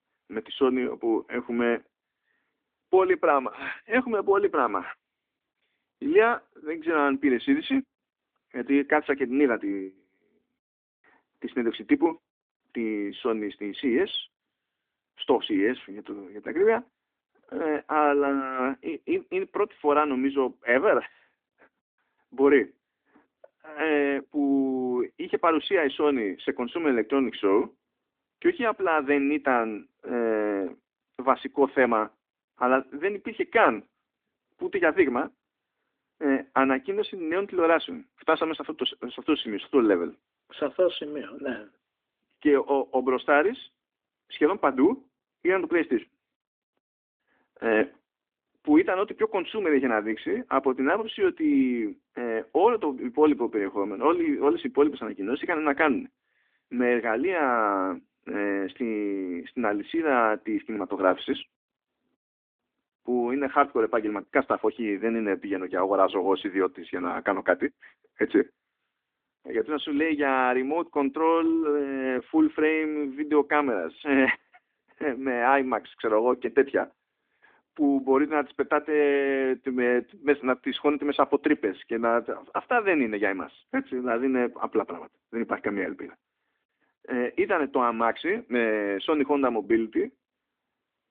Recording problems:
phone-call audio

